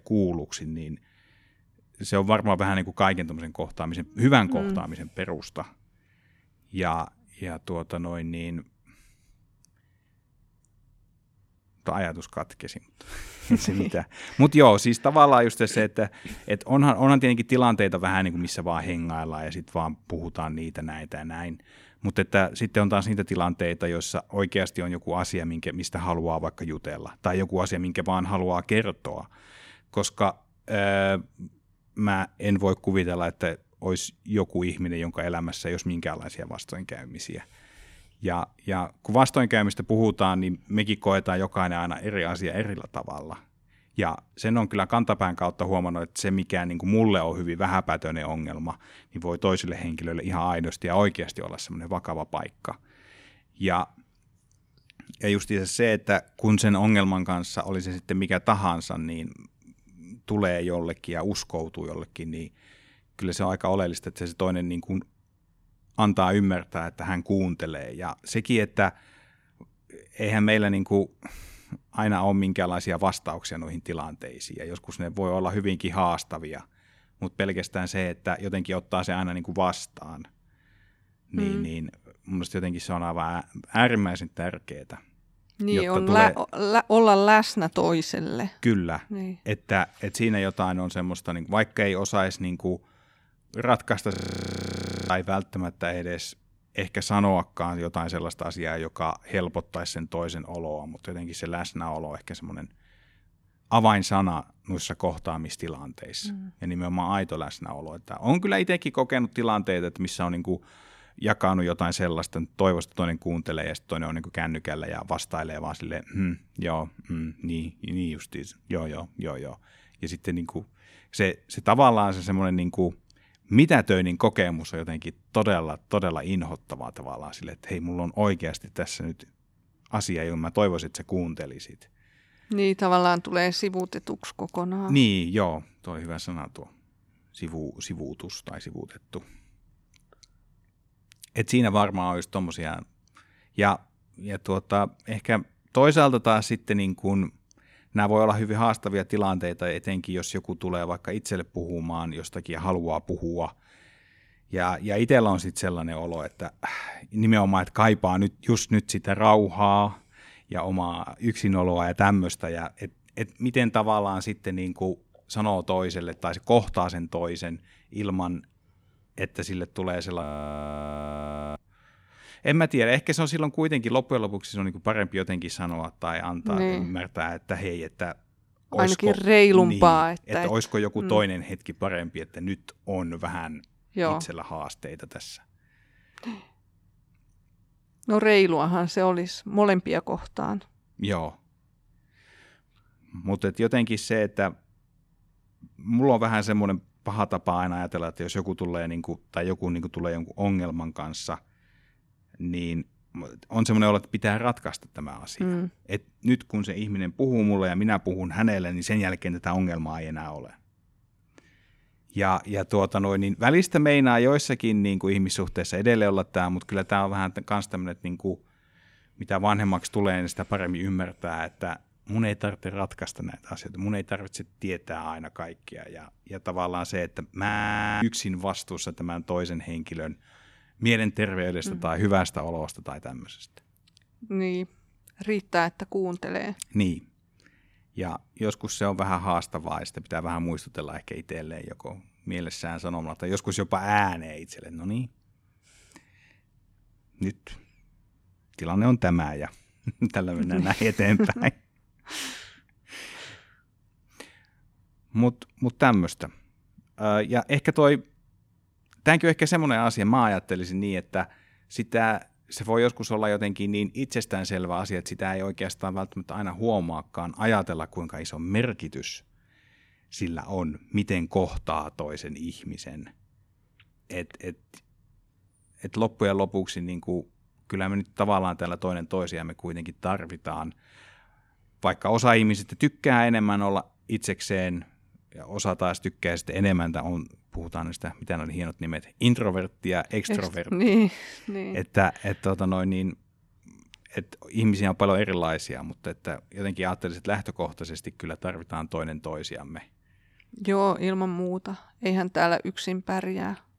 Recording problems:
audio freezing; at 1:34 for 1 s, at 2:50 for 1.5 s and at 3:47 for 0.5 s

